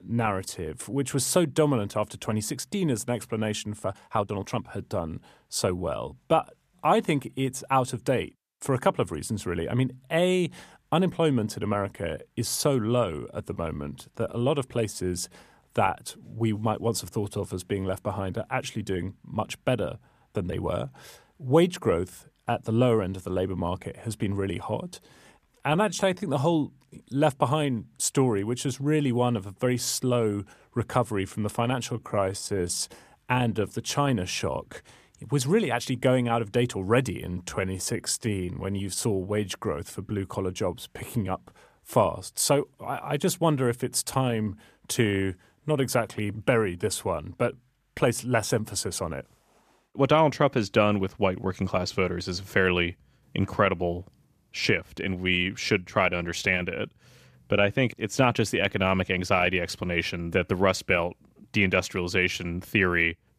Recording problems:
uneven, jittery; strongly; from 4 to 38 s

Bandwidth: 14.5 kHz